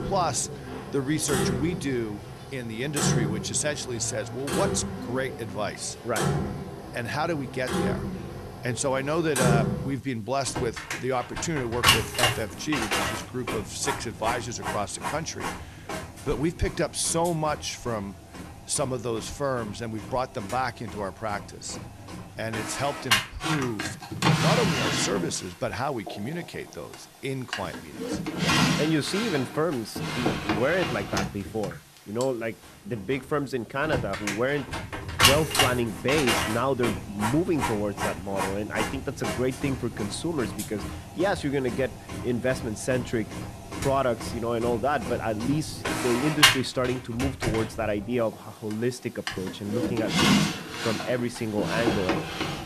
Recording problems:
household noises; very loud; throughout; 1 dB above the speech

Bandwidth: 13.5 kHz